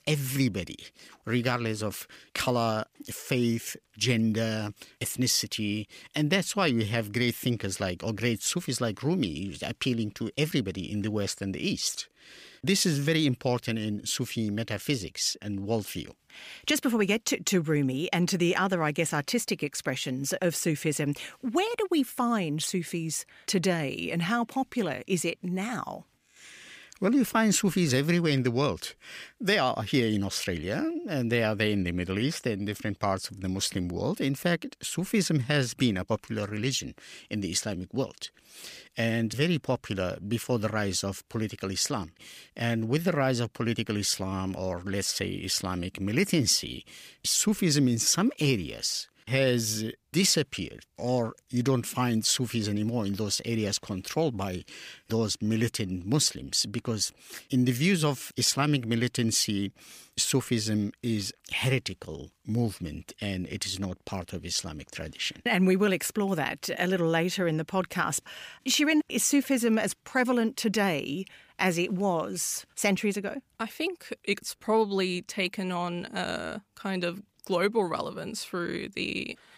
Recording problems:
none

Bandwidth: 15 kHz